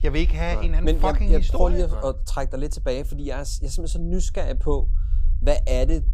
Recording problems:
low rumble; faint; throughout; 20 dB below the speech

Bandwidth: 15.5 kHz